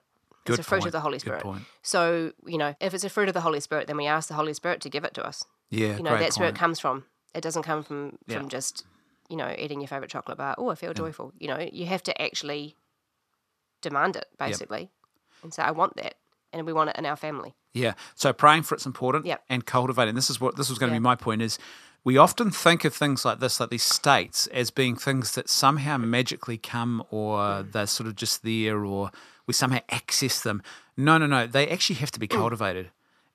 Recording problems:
thin; somewhat; fading below 700 Hz

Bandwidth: 14 kHz